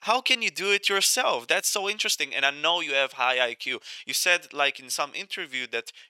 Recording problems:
thin; very; fading below 650 Hz

